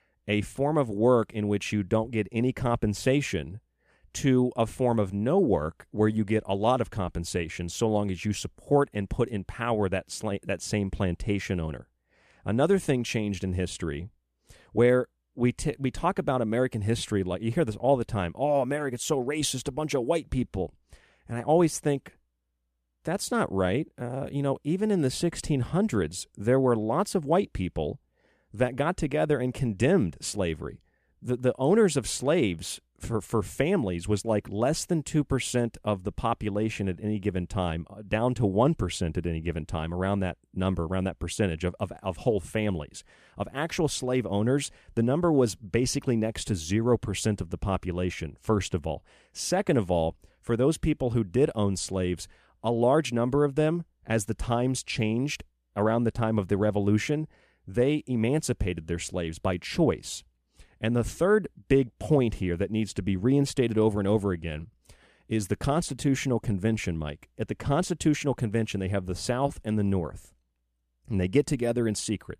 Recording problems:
none

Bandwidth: 14.5 kHz